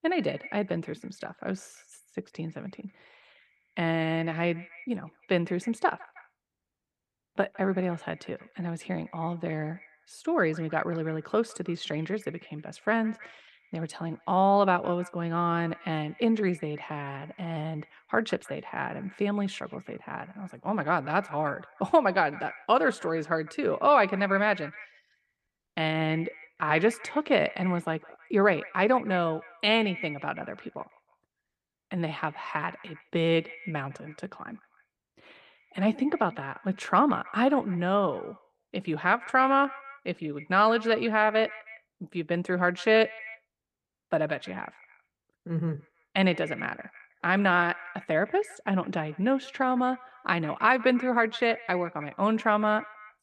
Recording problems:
echo of what is said; faint; throughout; 160 ms later, 20 dB below the speech

